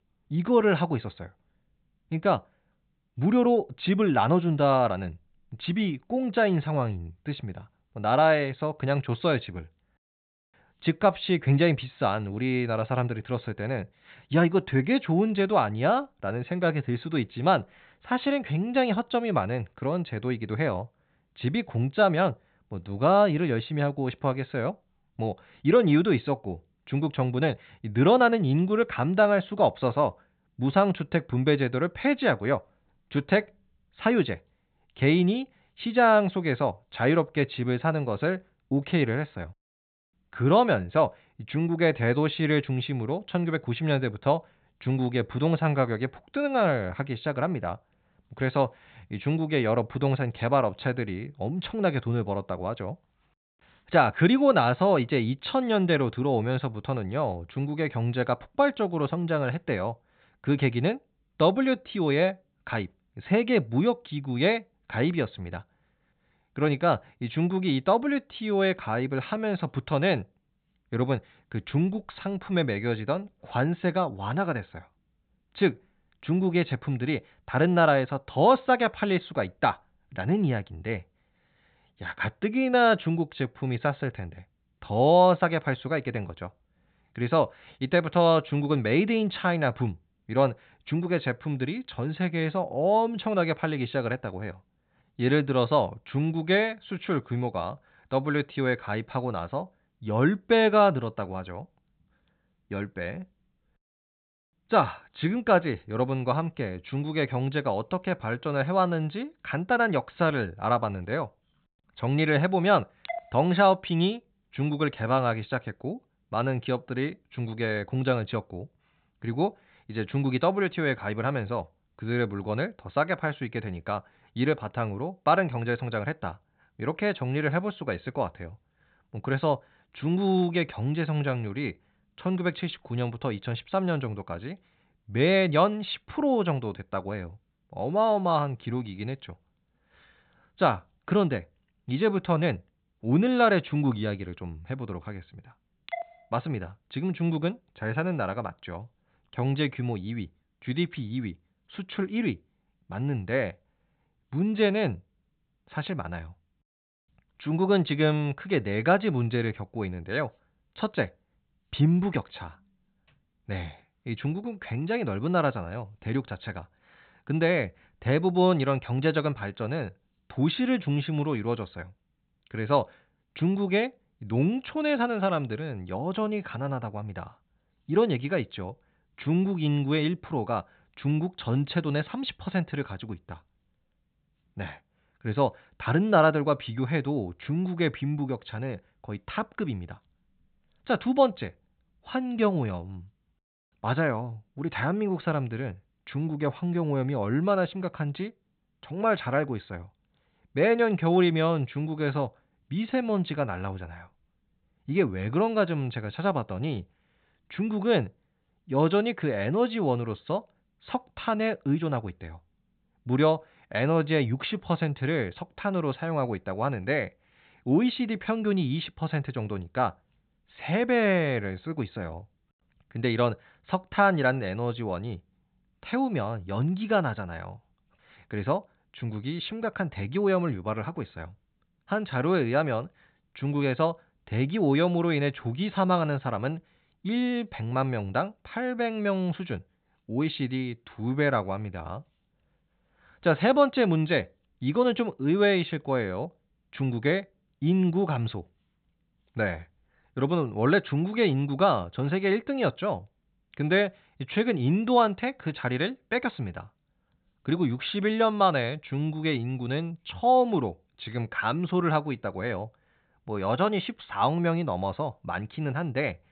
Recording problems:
high frequencies cut off; severe; nothing above 4 kHz

